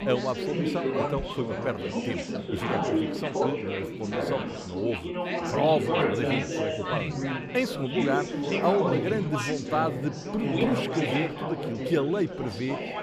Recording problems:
chatter from many people; very loud; throughout; 1 dB above the speech

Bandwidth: 15 kHz